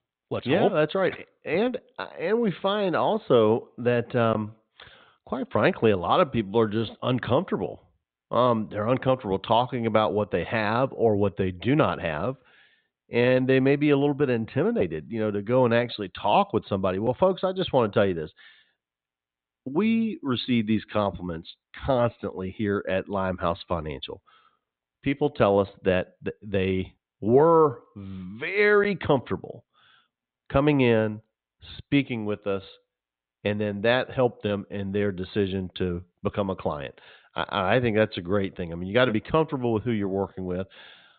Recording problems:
high frequencies cut off; severe; nothing above 4 kHz

